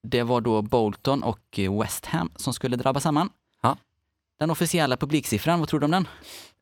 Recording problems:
none

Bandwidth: 17.5 kHz